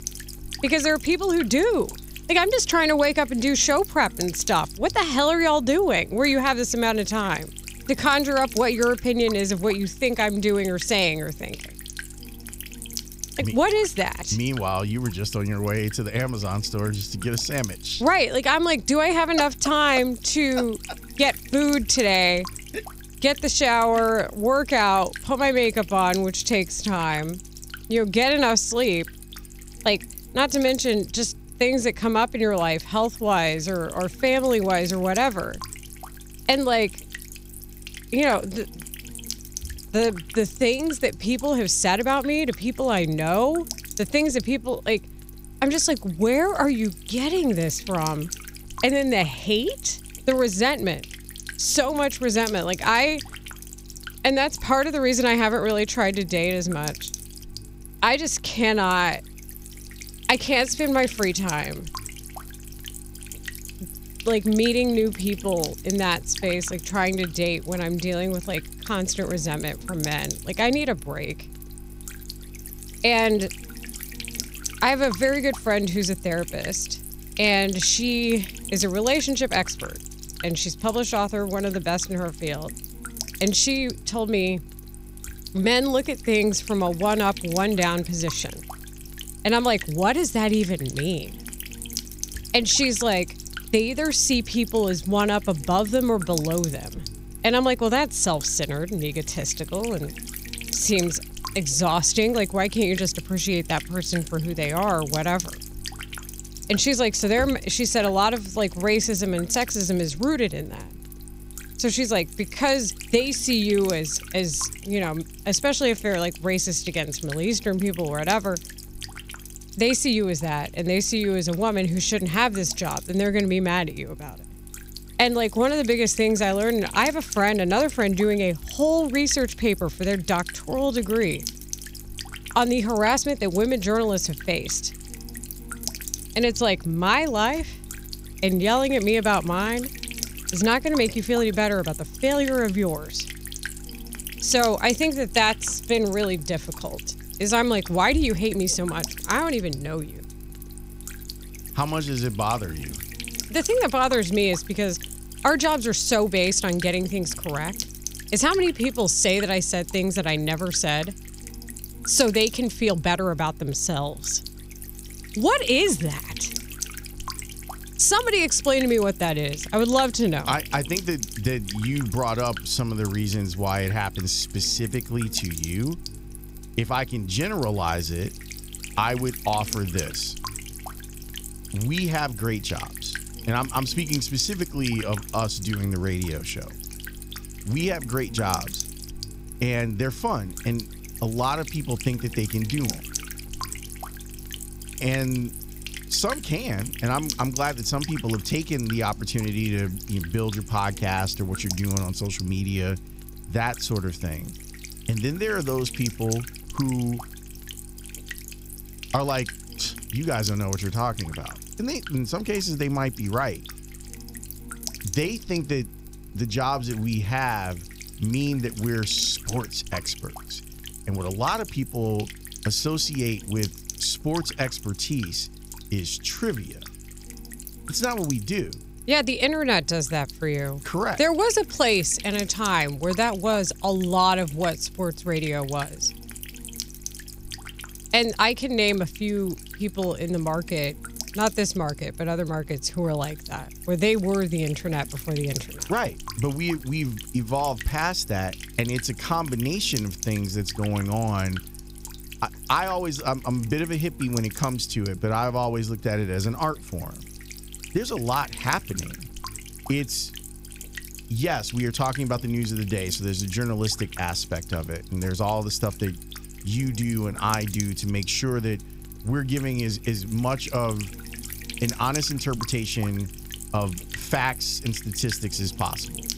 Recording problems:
electrical hum; noticeable; throughout; 50 Hz, 15 dB below the speech

